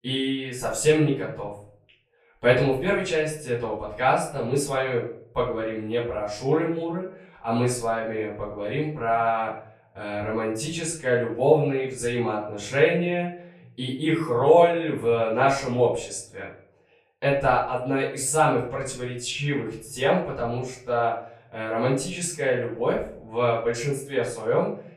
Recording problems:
off-mic speech; far
room echo; slight; dies away in 0.5 s

